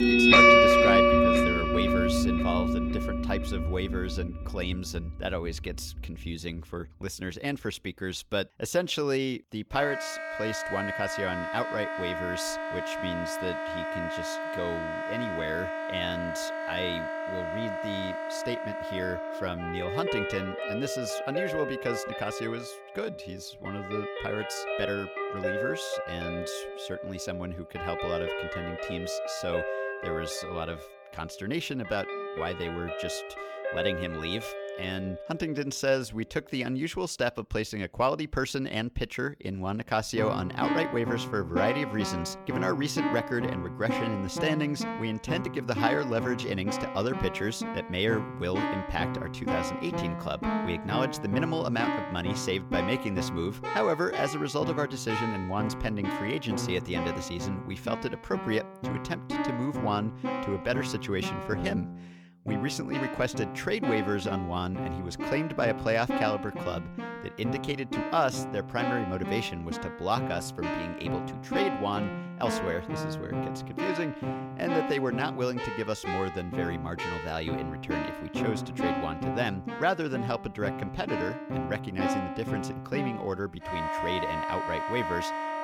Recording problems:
background music; very loud; throughout; 2 dB above the speech

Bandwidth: 17 kHz